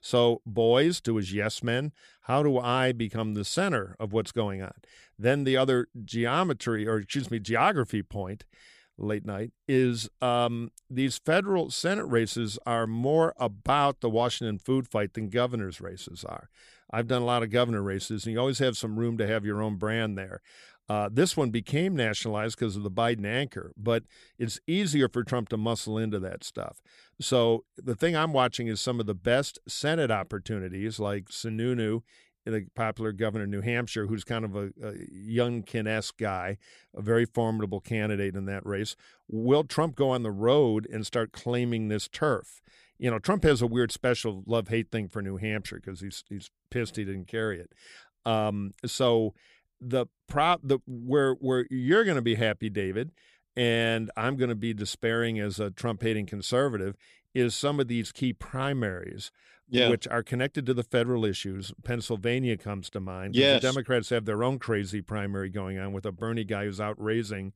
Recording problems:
none

